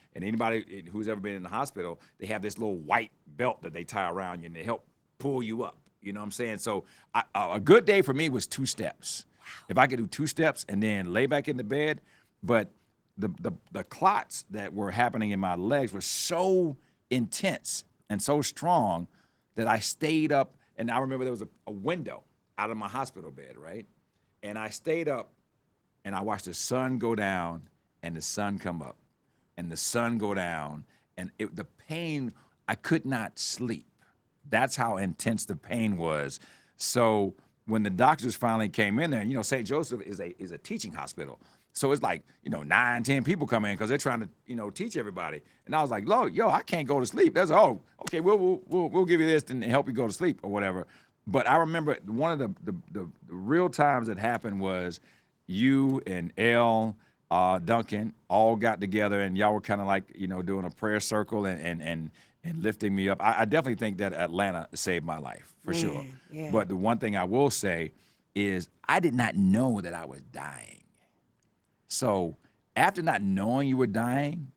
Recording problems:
garbled, watery; slightly; nothing above 19.5 kHz

